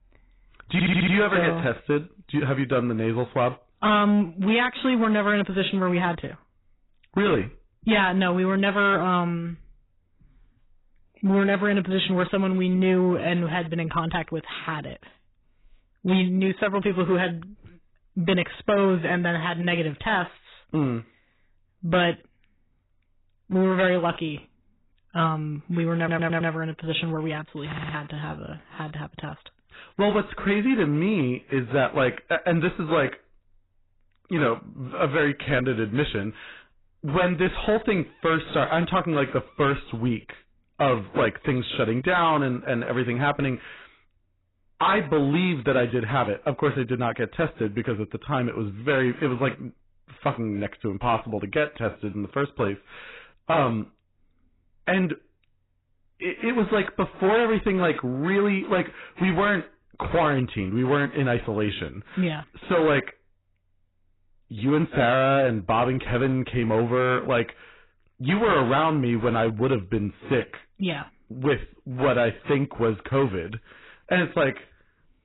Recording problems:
garbled, watery; badly; nothing above 4 kHz
distortion; slight; 6% of the sound clipped
audio stuttering; at 0.5 s, at 26 s and at 28 s

